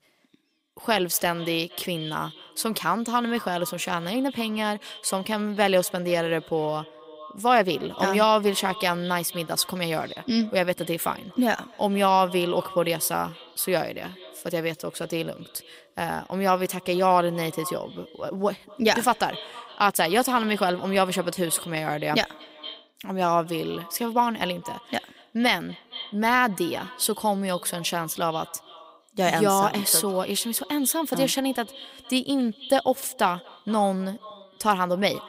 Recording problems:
echo of what is said; faint; throughout; 230 ms later, 20 dB below the speech

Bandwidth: 15.5 kHz